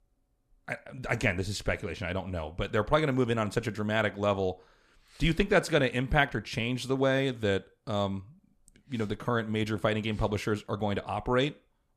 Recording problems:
none

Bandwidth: 13.5 kHz